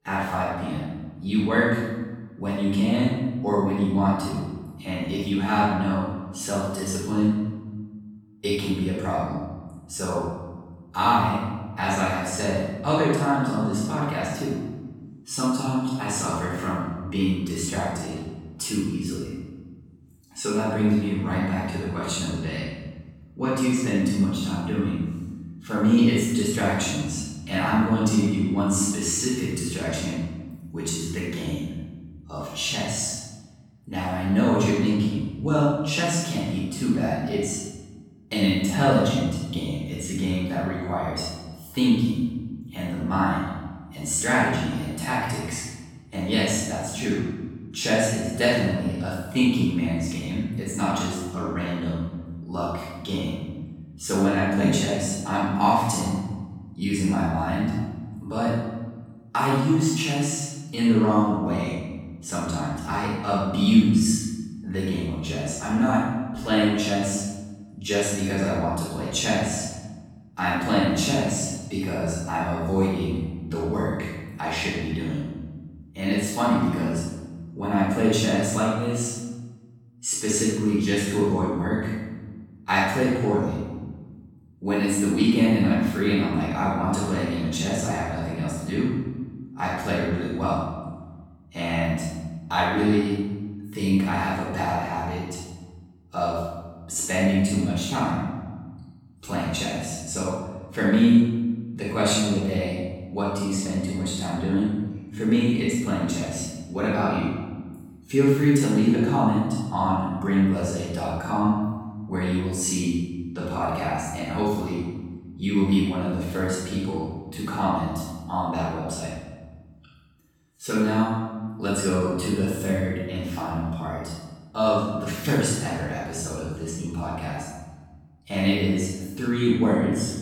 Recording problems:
room echo; strong; dies away in 1.3 s
off-mic speech; far

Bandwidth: 17.5 kHz